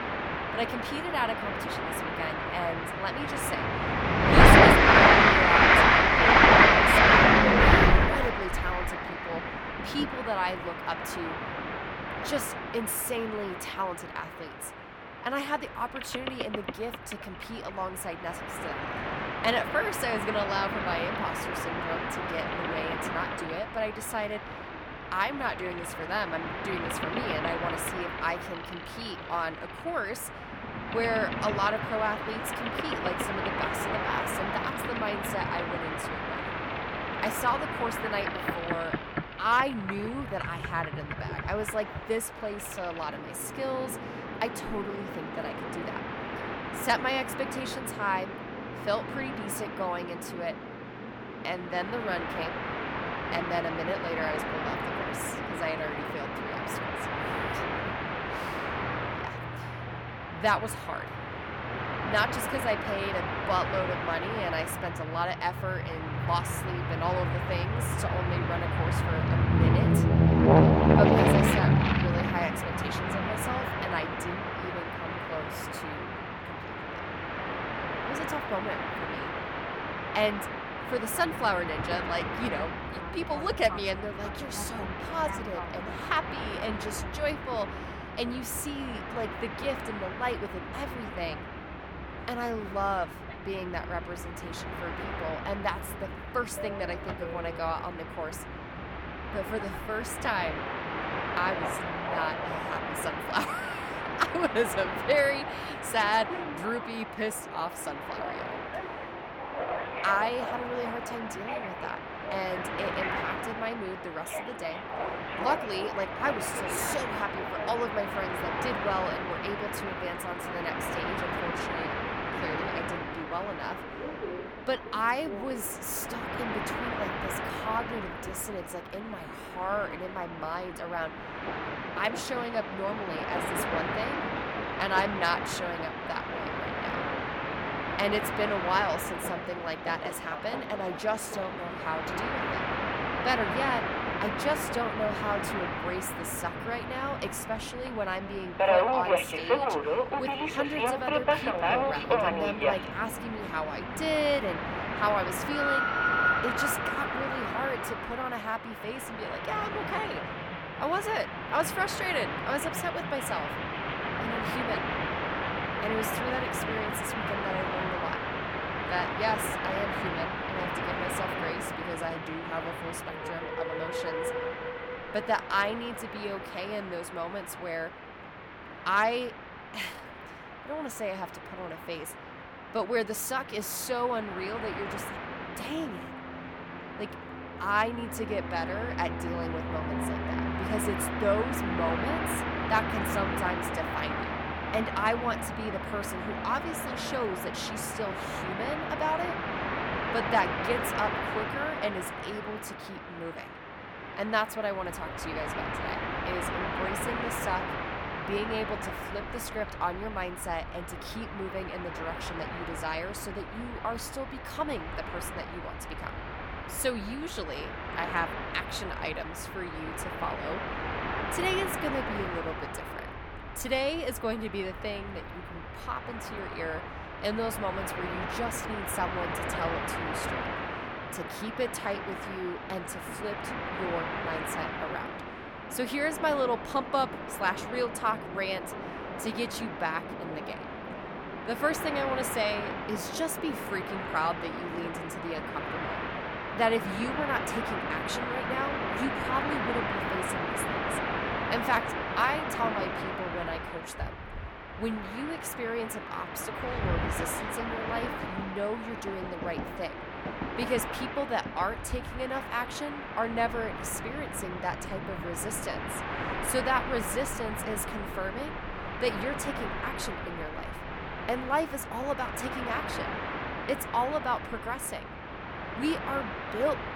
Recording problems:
train or aircraft noise; very loud; throughout; 3 dB above the speech

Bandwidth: 18 kHz